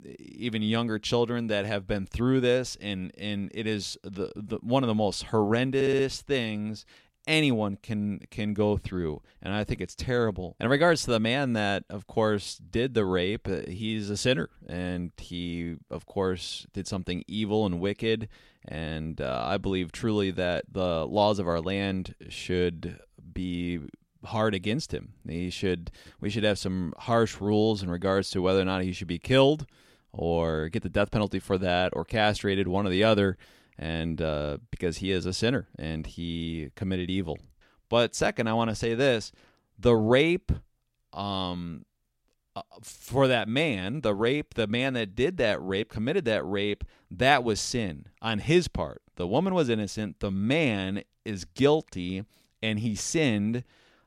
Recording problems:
audio stuttering; at 6 s

